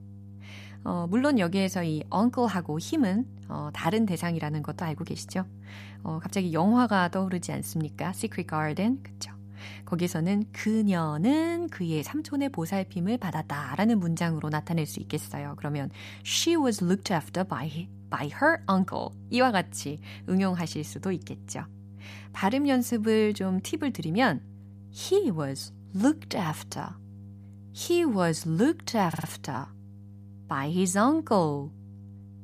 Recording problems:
electrical hum; faint; throughout; 50 Hz, 25 dB below the speech
audio stuttering; at 29 s

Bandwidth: 14.5 kHz